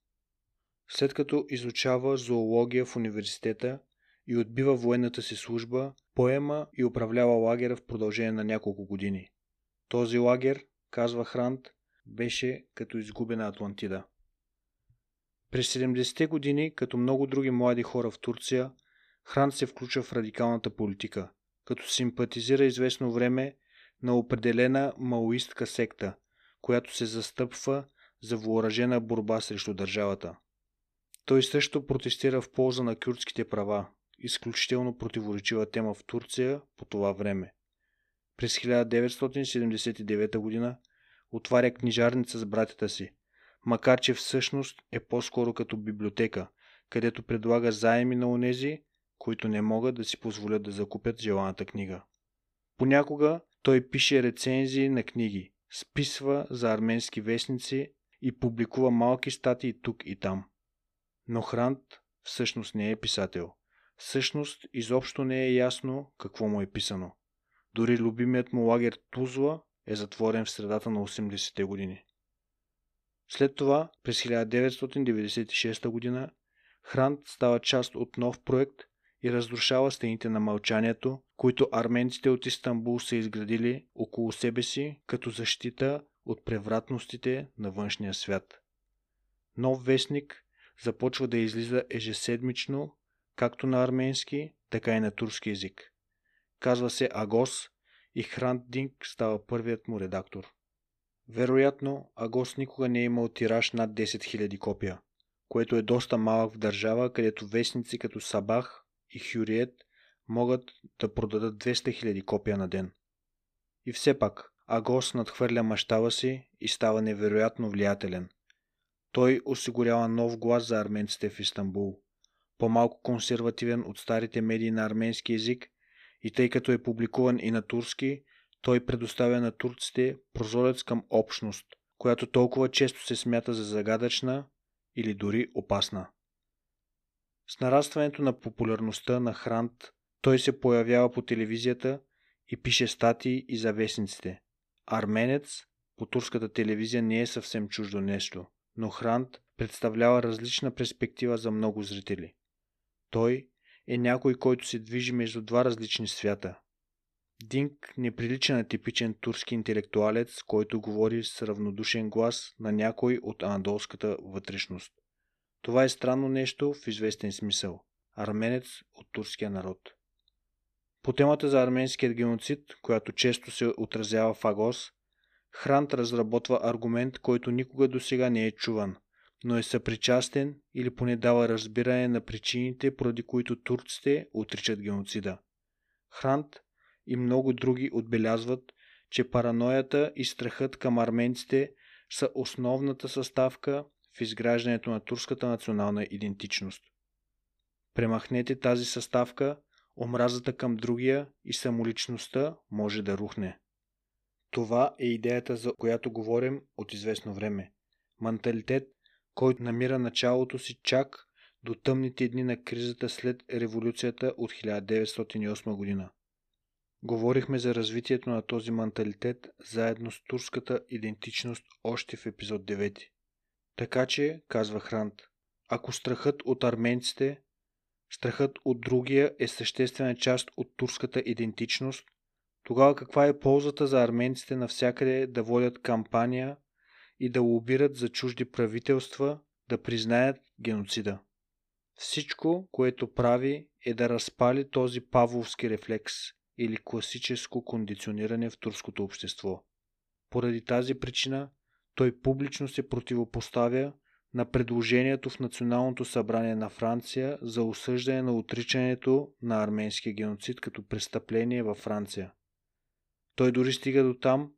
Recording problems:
none

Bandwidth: 14.5 kHz